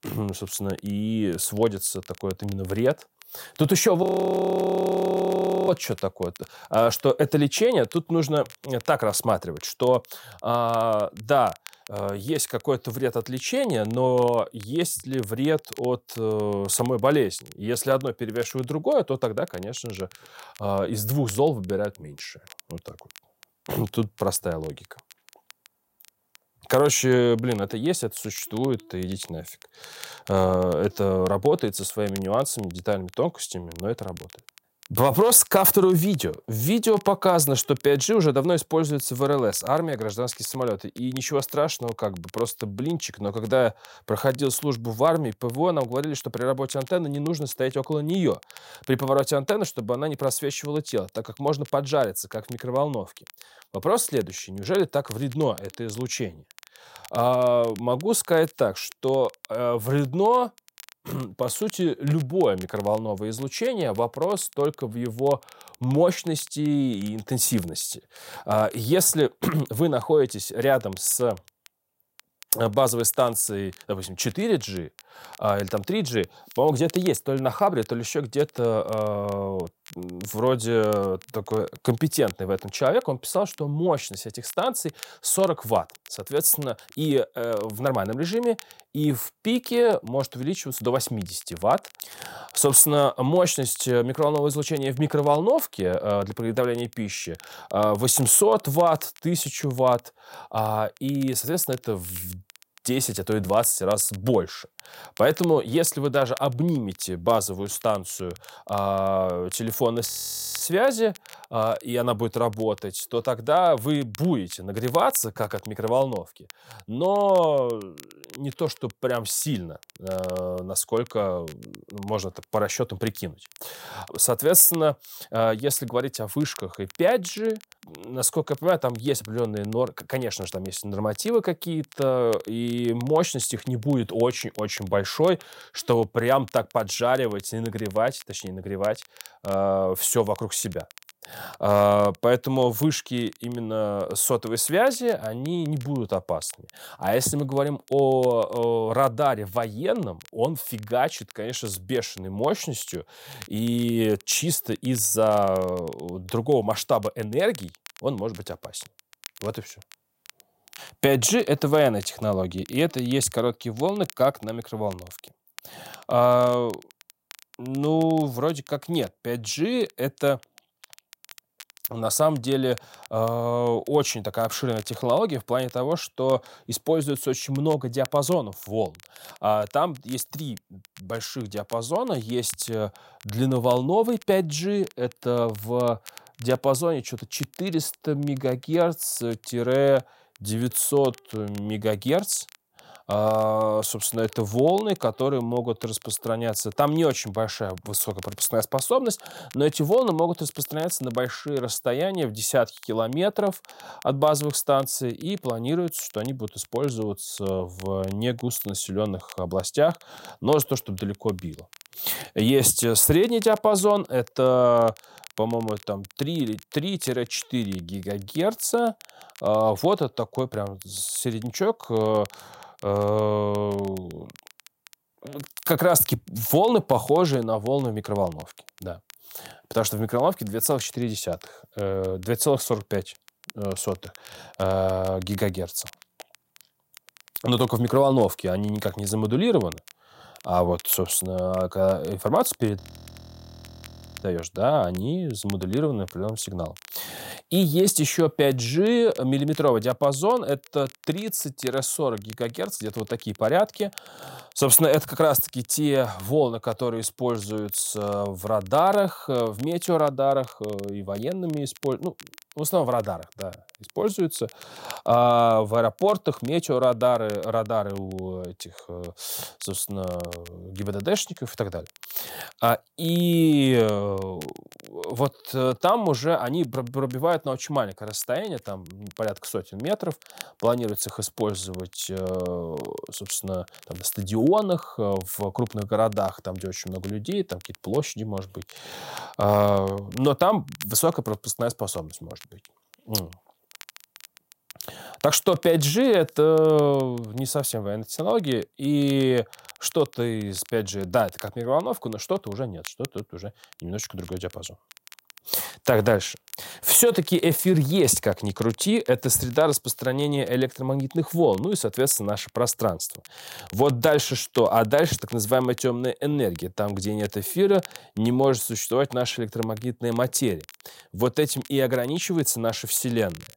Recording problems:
crackle, like an old record; faint; 25 dB below the speech
audio freezing; at 4 s for 1.5 s, at 1:50 for 0.5 s and at 4:03 for 1.5 s

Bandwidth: 16 kHz